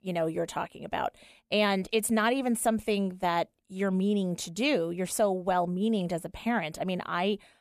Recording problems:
none

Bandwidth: 14.5 kHz